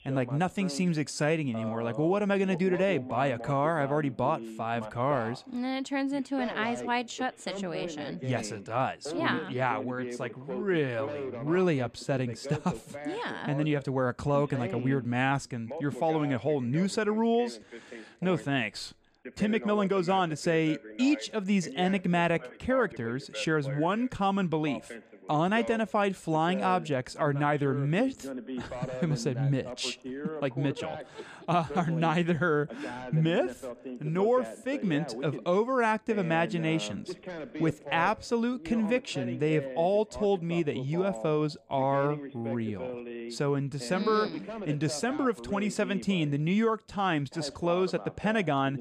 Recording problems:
voice in the background; noticeable; throughout; 10 dB below the speech

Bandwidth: 14.5 kHz